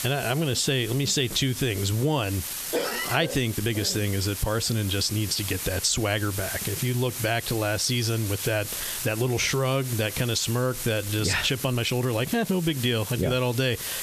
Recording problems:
squashed, flat; somewhat
hiss; loud; throughout; 9 dB below the speech
uneven, jittery; strongly; from 2.5 to 13 s

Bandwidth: 14 kHz